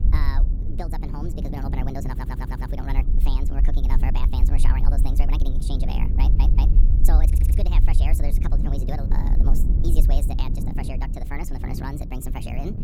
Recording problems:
wrong speed and pitch; too fast and too high; 1.5 times normal speed
wind noise on the microphone; heavy; 7 dB below the speech
low rumble; loud; throughout; 8 dB below the speech
audio stuttering; at 2 s, at 6 s and at 7.5 s

